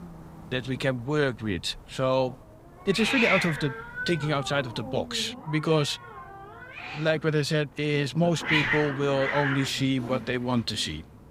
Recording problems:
hiss; loud; throughout; 3 dB below the speech

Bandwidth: 15.5 kHz